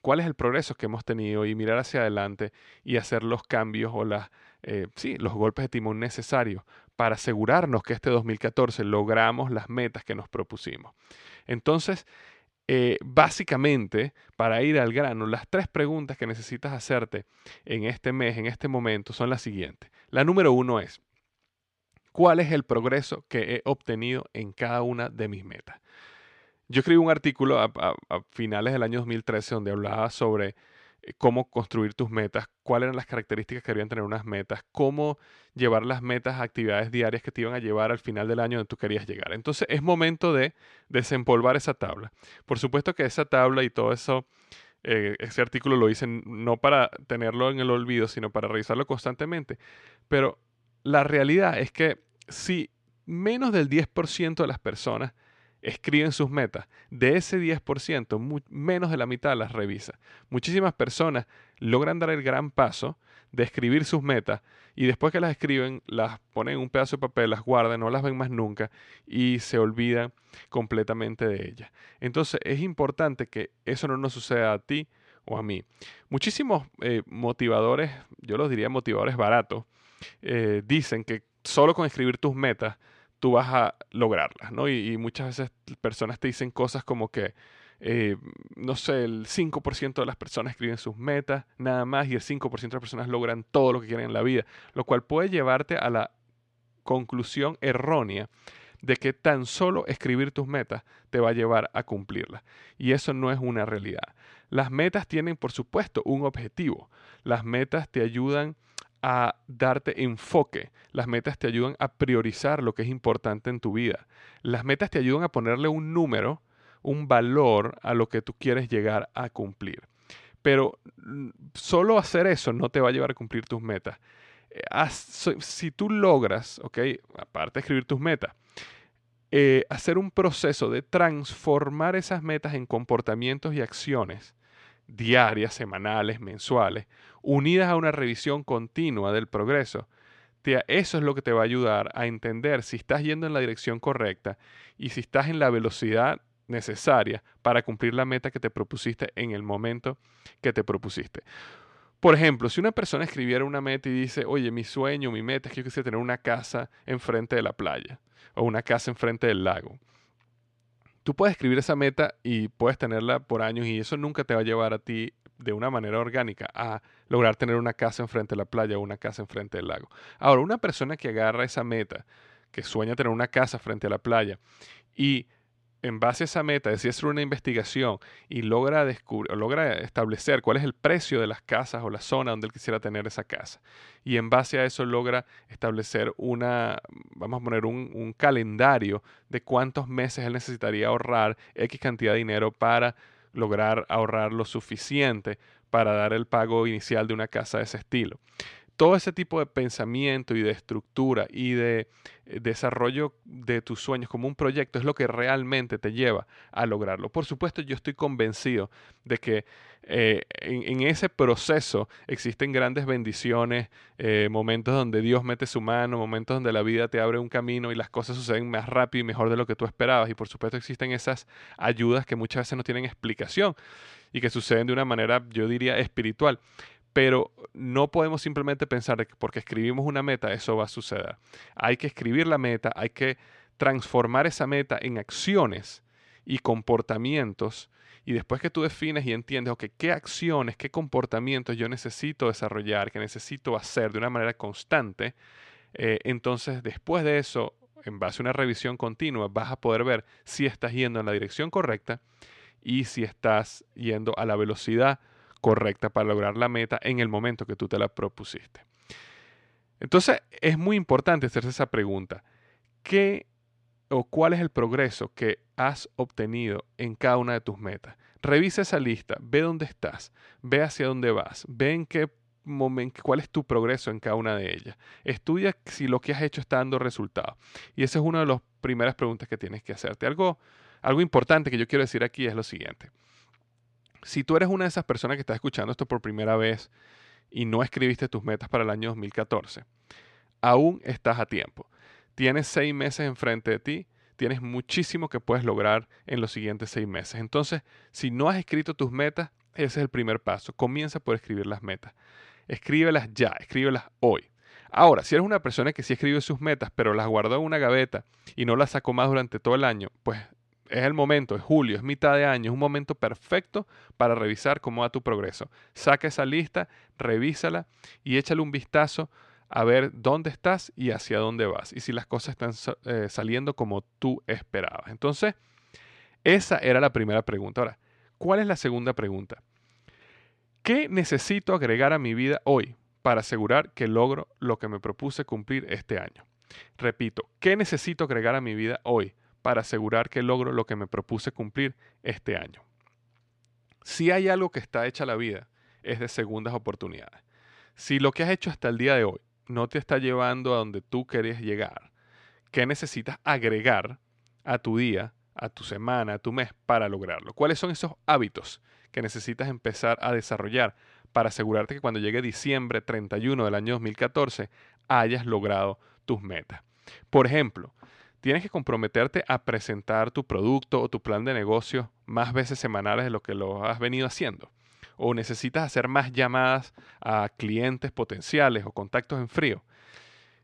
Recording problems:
none

